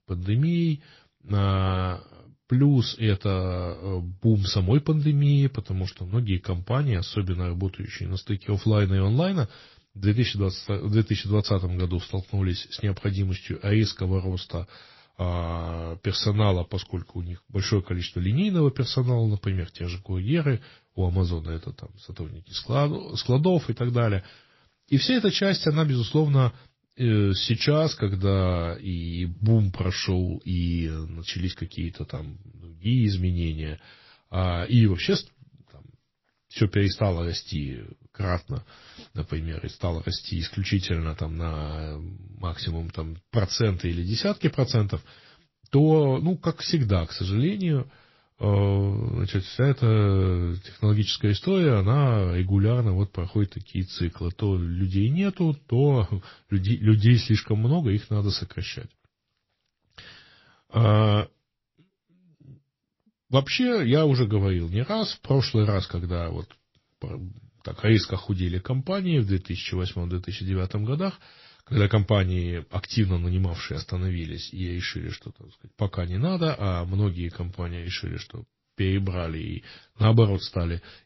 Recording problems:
garbled, watery; slightly; nothing above 5.5 kHz

